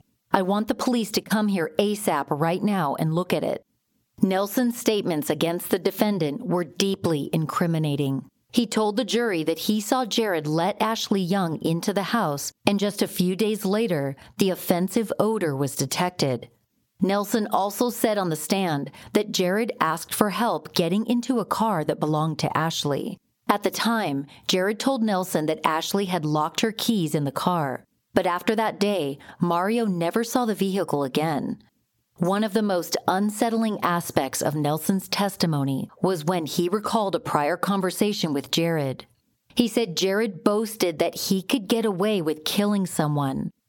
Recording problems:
squashed, flat; somewhat

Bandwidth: 17.5 kHz